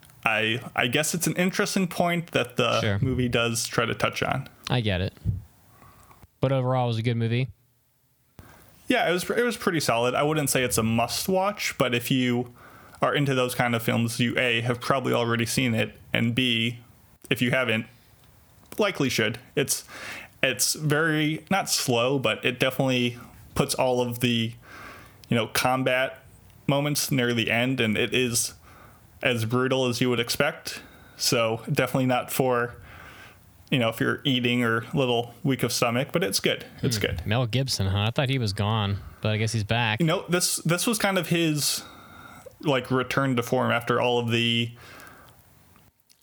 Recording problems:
squashed, flat; somewhat

